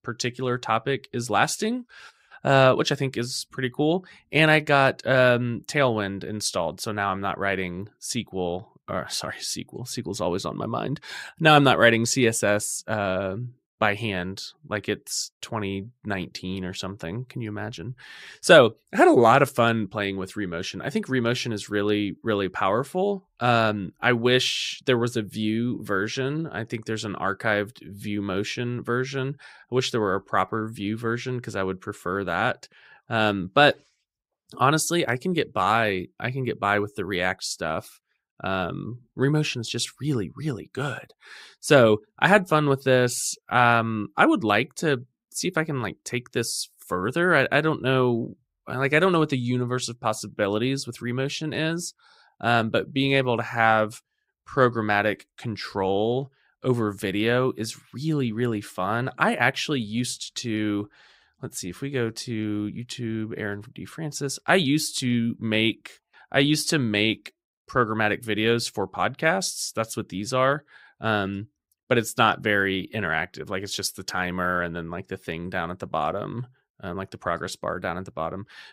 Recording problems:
none

